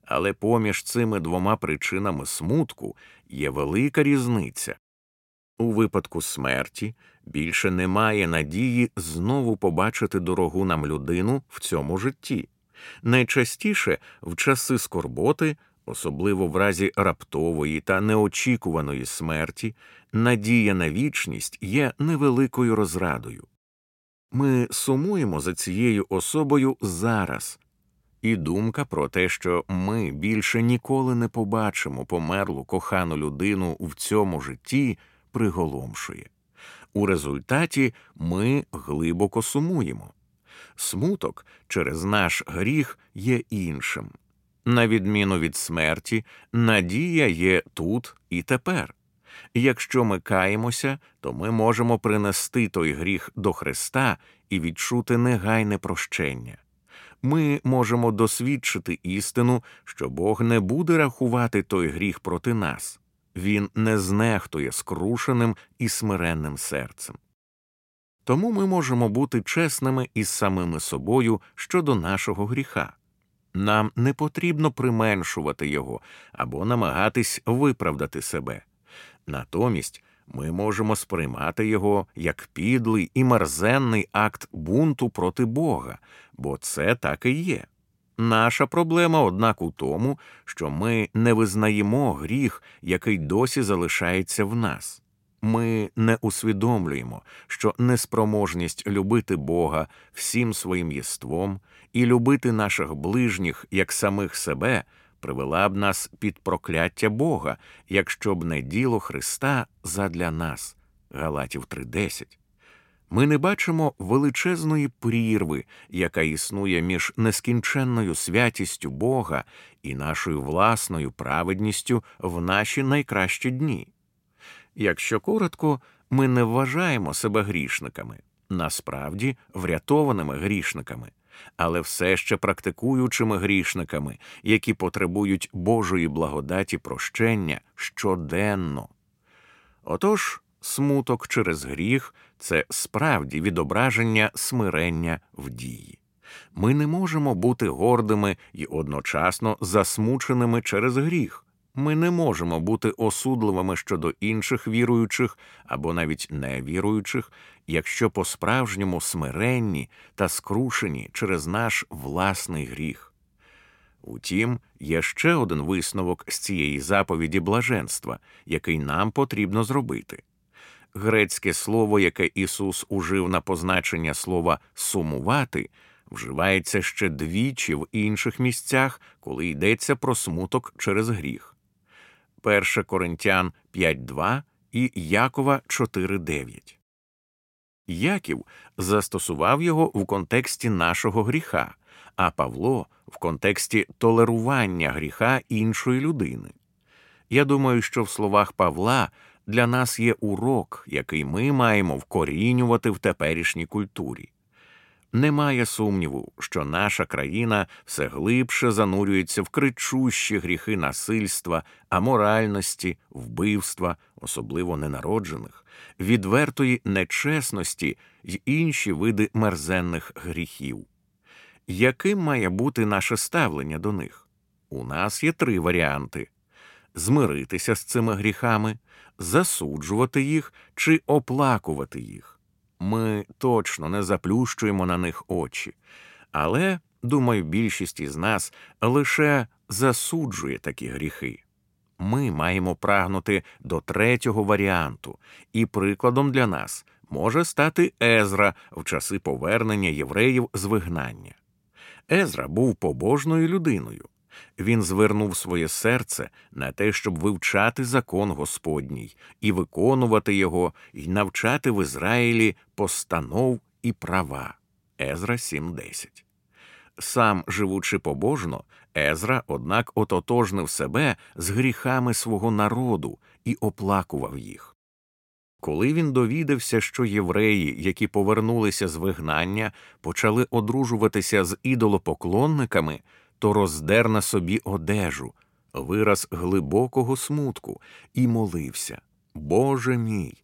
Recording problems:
none

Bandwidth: 16.5 kHz